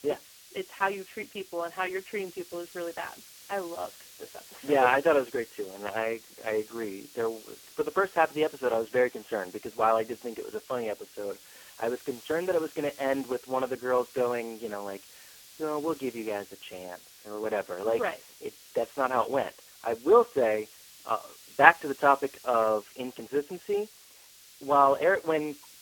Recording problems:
phone-call audio; poor line
hiss; faint; throughout; 20 dB below the speech

